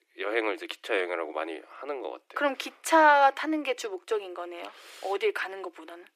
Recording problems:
thin; very; fading below 300 Hz

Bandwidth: 14.5 kHz